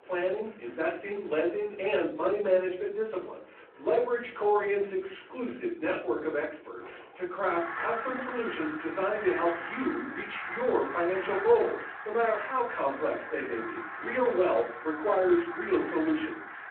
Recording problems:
off-mic speech; far
room echo; slight; dies away in 0.4 s
phone-call audio
animal sounds; loud; throughout; 8 dB below the speech

